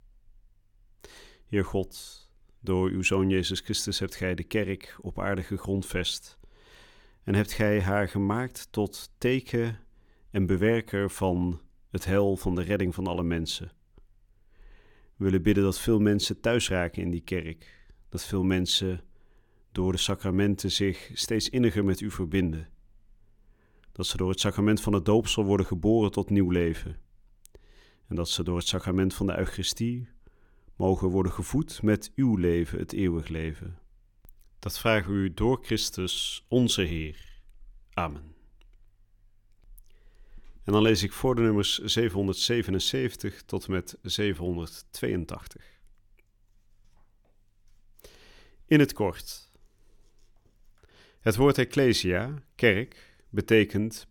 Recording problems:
none

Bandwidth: 17.5 kHz